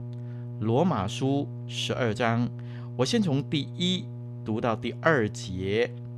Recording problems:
electrical hum; noticeable; throughout; 60 Hz, 20 dB below the speech

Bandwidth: 13.5 kHz